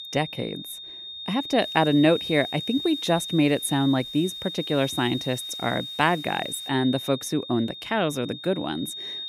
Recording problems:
high-pitched whine; loud; throughout; 3.5 kHz, 8 dB below the speech
hiss; faint; from 1.5 to 6.5 s; 30 dB below the speech

